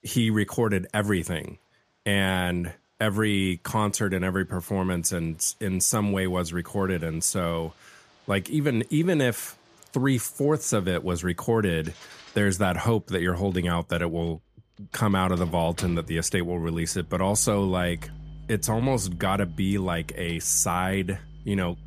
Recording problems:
household noises; faint; throughout; 20 dB below the speech

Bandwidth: 14.5 kHz